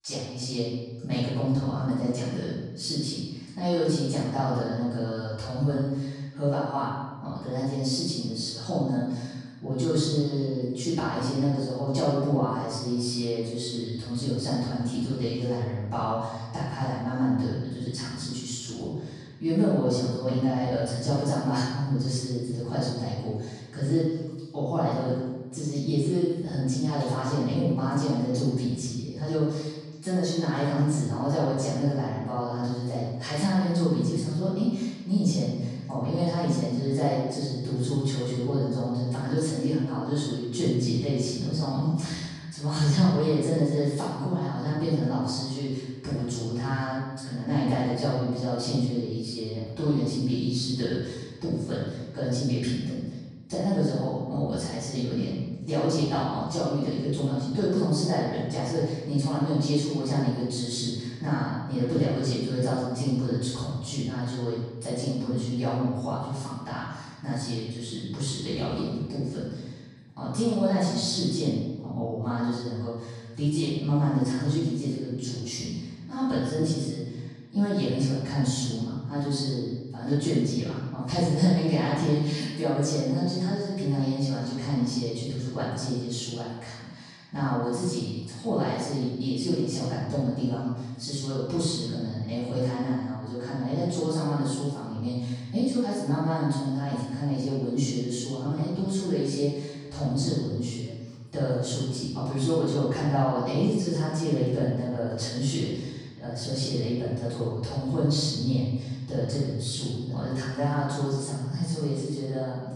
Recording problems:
room echo; strong; dies away in 1.2 s
off-mic speech; far

